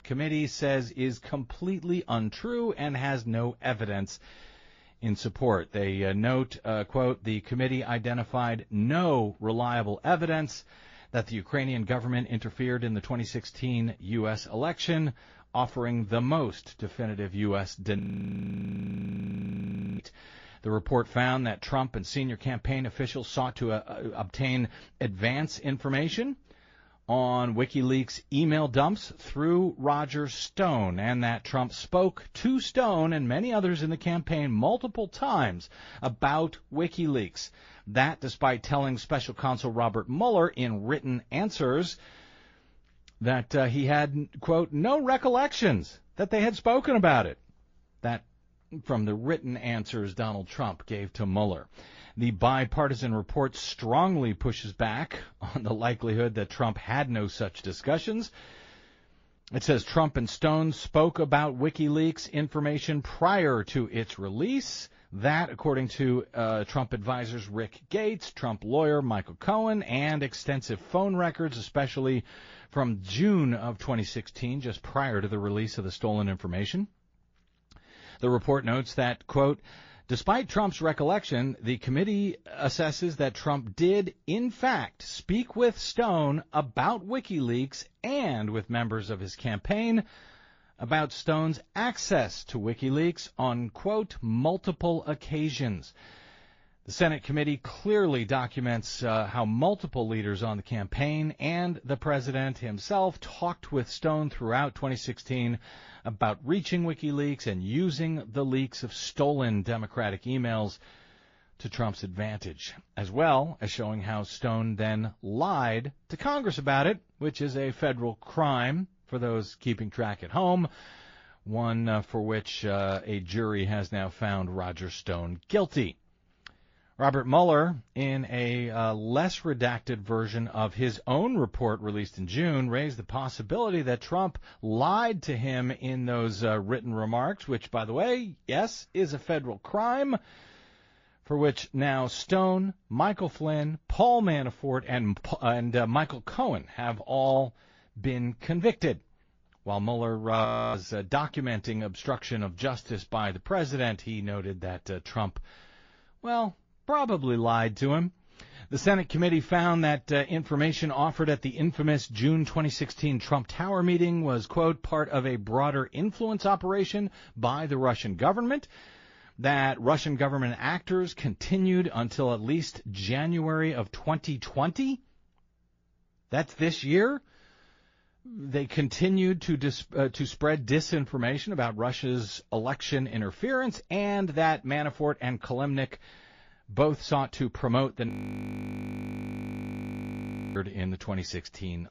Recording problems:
garbled, watery; slightly; nothing above 6 kHz
audio freezing; at 18 s for 2 s, at 2:30 and at 3:08 for 2.5 s

